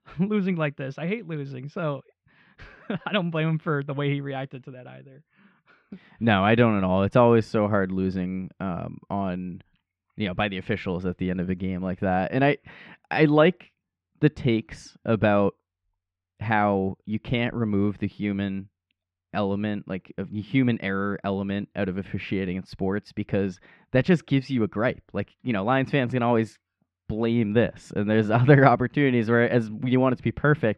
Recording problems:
muffled; slightly; fading above 2.5 kHz

